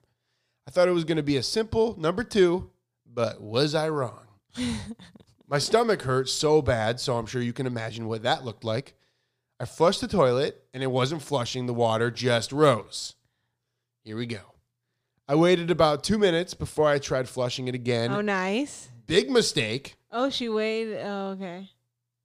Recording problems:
none

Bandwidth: 15 kHz